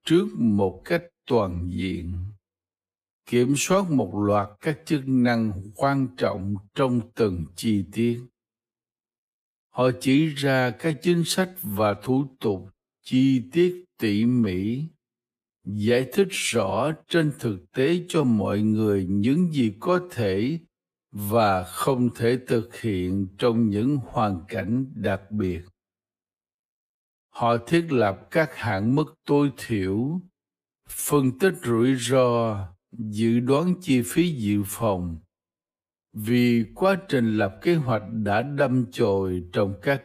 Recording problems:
wrong speed, natural pitch; too slow; 0.7 times normal speed

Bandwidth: 15 kHz